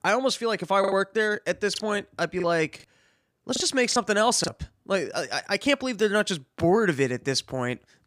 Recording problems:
choppy; very; at 1 s and from 2.5 to 4.5 s; 6% of the speech affected

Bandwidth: 15 kHz